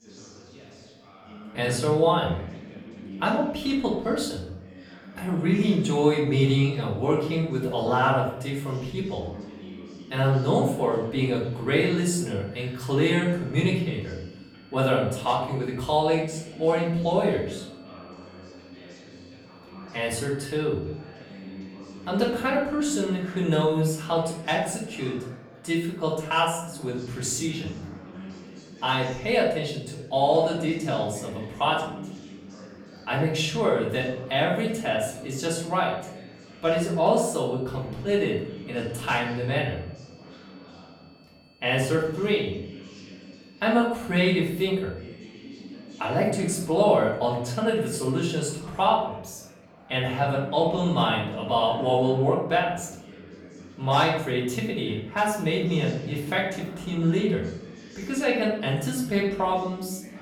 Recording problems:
off-mic speech; far
room echo; noticeable; dies away in 0.6 s
background chatter; noticeable; throughout; 3 voices, 20 dB below the speech
high-pitched whine; faint; from 11 to 23 s and from 35 to 48 s; 4.5 kHz, 30 dB below the speech

